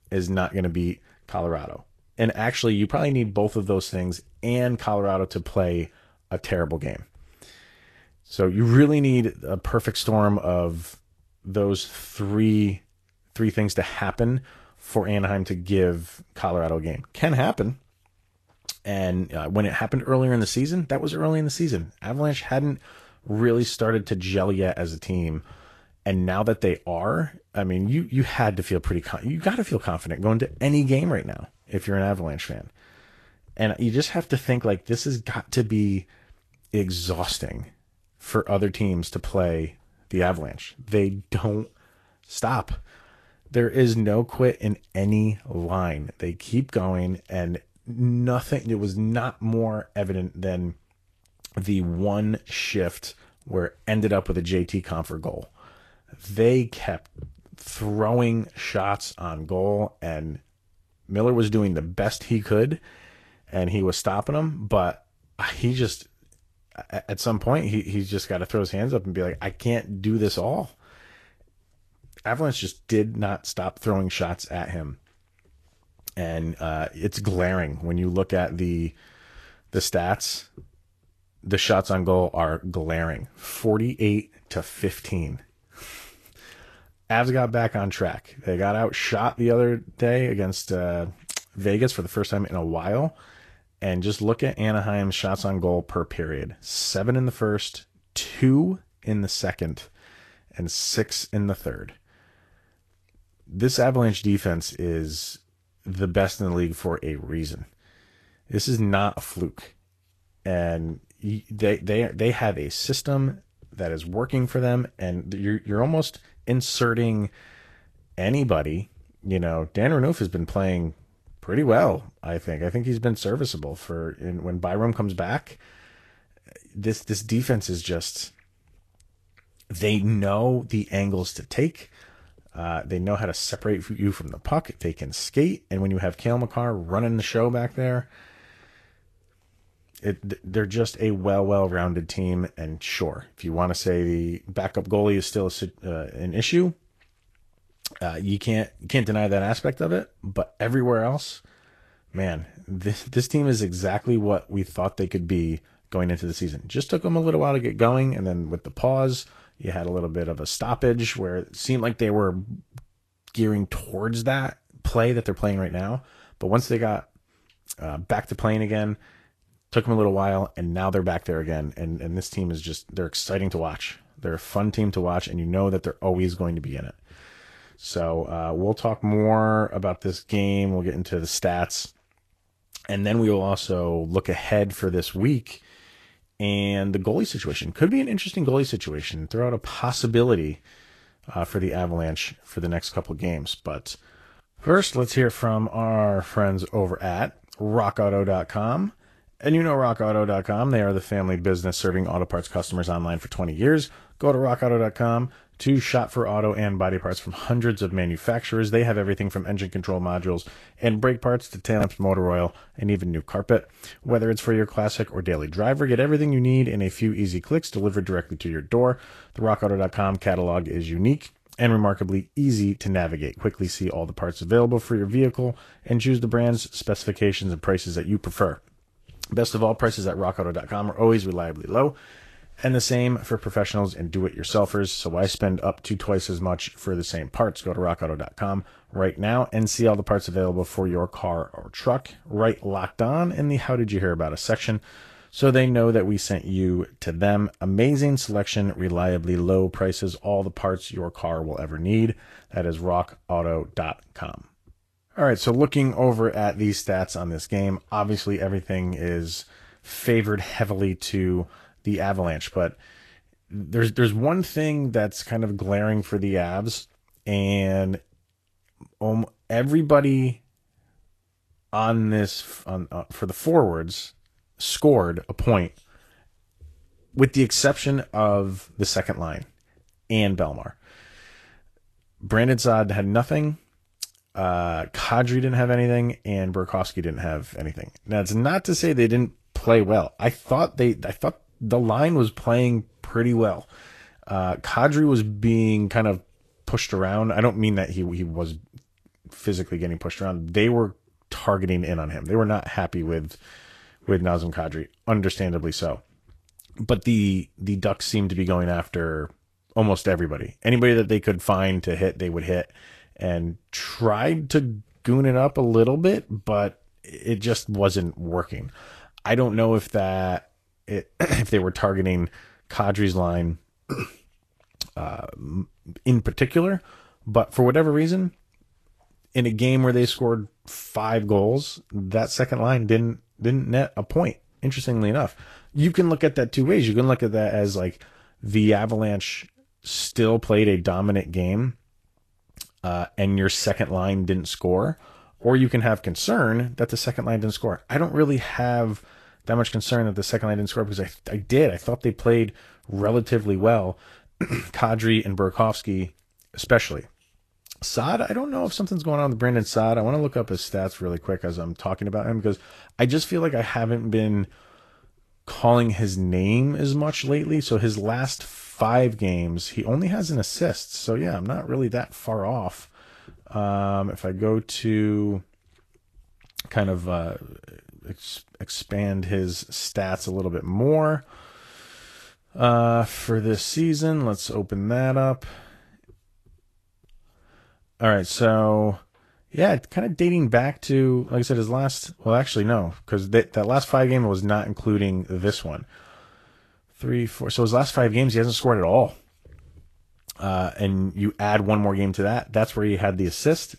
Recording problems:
garbled, watery; slightly; nothing above 13 kHz

